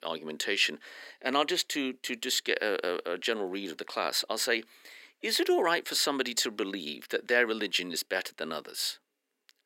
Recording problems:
thin; somewhat; fading below 300 Hz

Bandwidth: 16 kHz